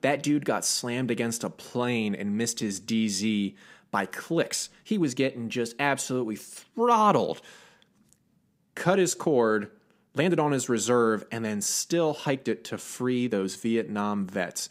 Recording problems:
uneven, jittery; strongly; from 1.5 to 14 s

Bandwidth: 15.5 kHz